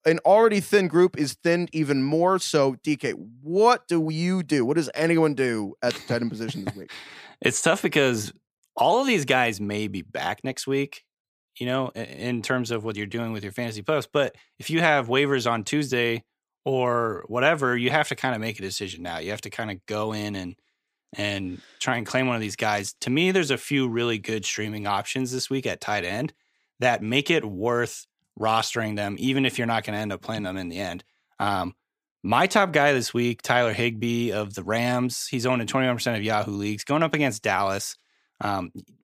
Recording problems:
none

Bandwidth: 15 kHz